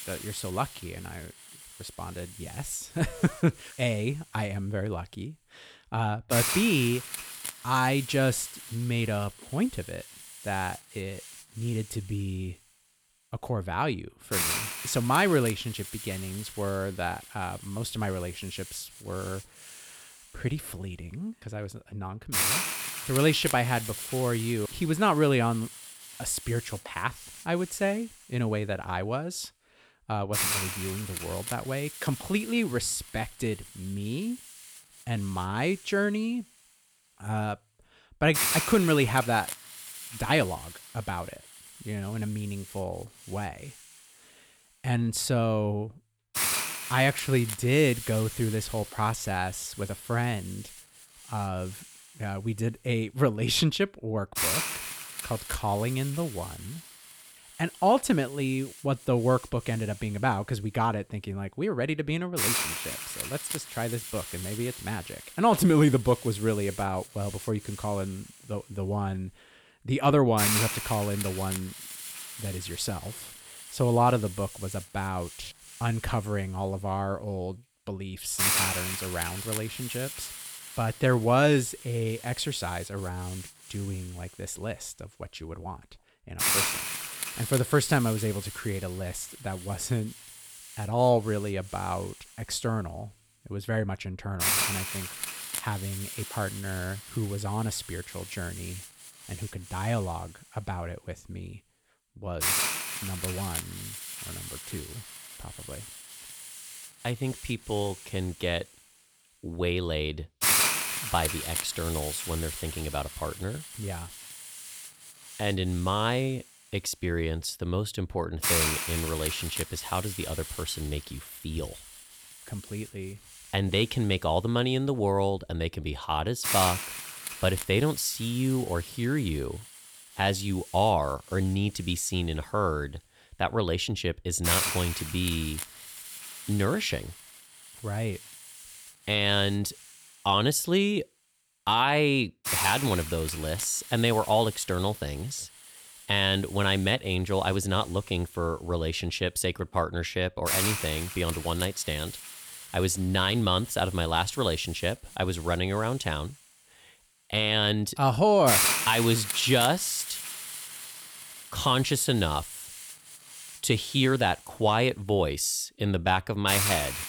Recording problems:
hiss; loud; throughout; 4 dB below the speech

